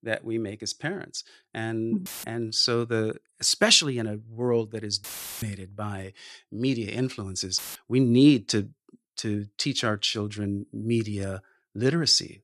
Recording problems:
audio cutting out; filled with static; at 2 s, at 5 s and at 7.5 s

